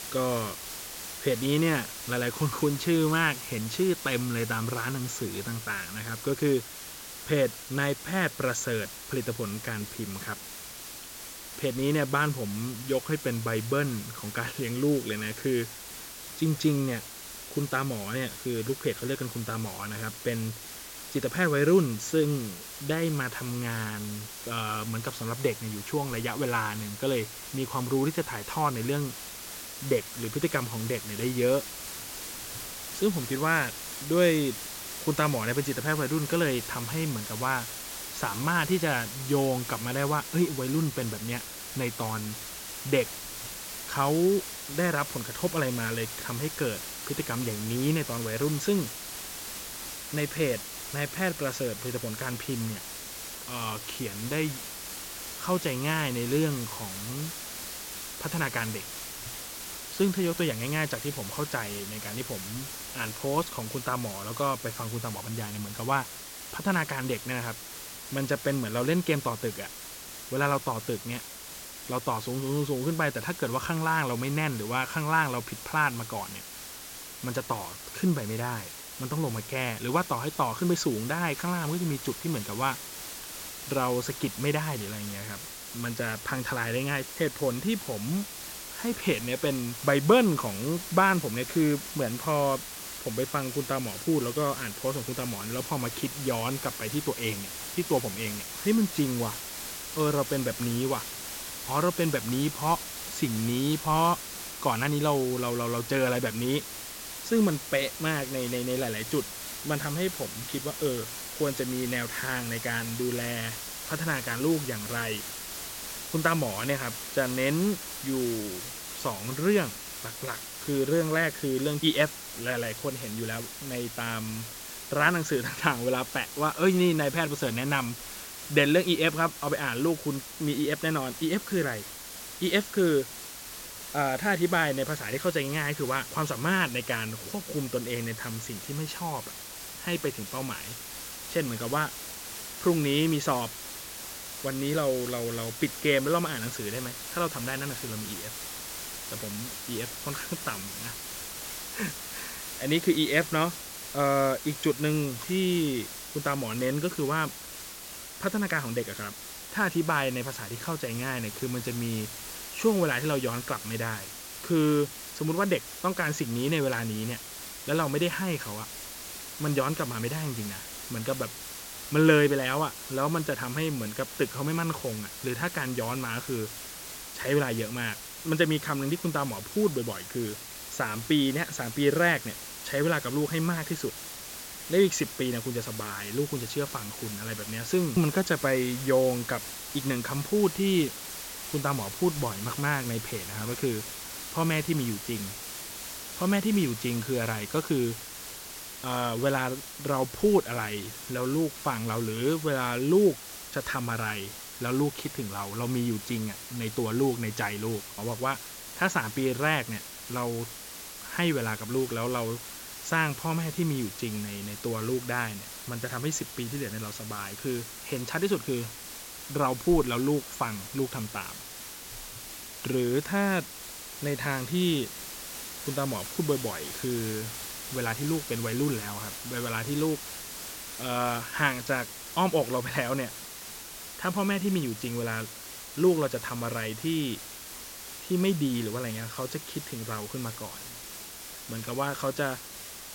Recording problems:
high frequencies cut off; noticeable; nothing above 8 kHz
hiss; loud; throughout; 8 dB below the speech

